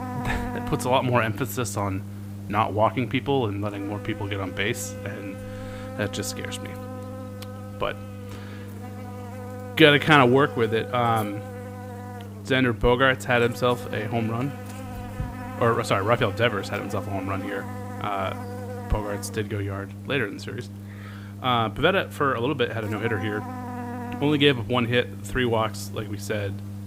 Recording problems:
electrical hum; noticeable; throughout; 50 Hz, 15 dB below the speech

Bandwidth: 15.5 kHz